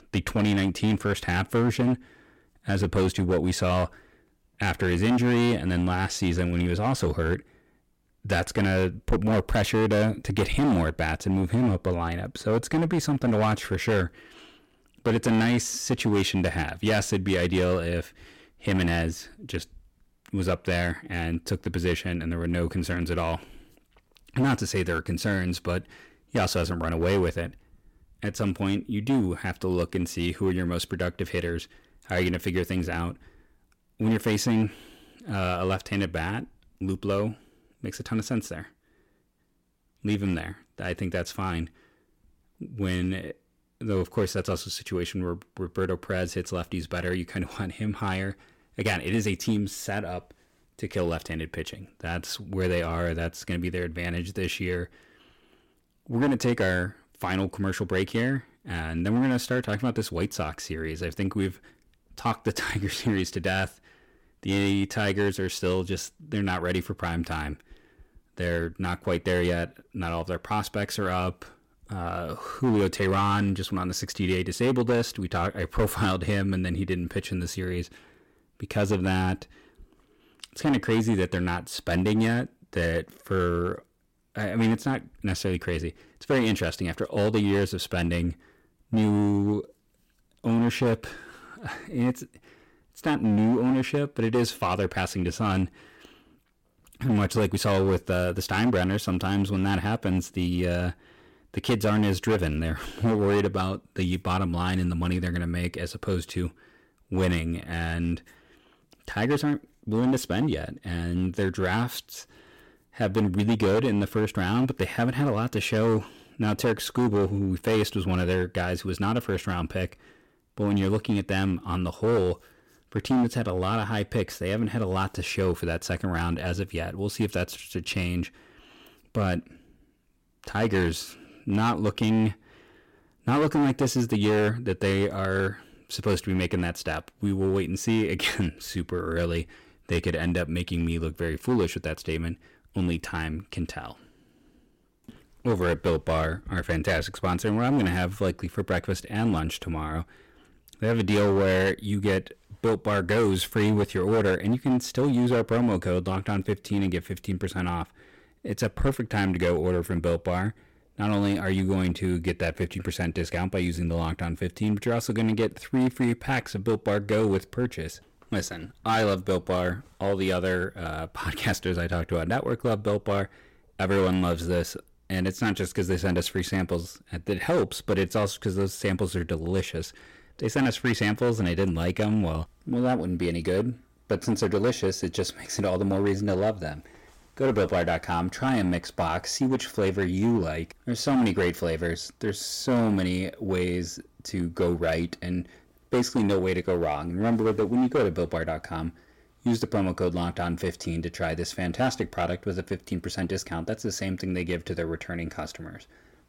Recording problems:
distortion; slight; 7% of the sound clipped

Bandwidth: 16.5 kHz